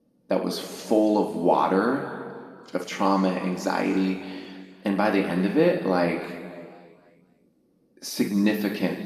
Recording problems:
room echo; noticeable; dies away in 1.7 s
off-mic speech; somewhat distant

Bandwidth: 14.5 kHz